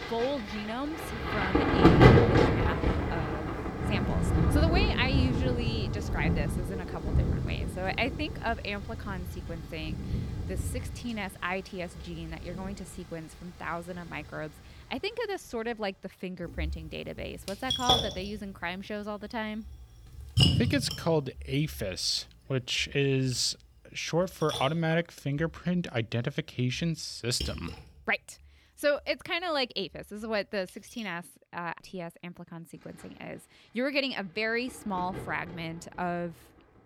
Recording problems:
rain or running water; very loud; throughout; 5 dB above the speech

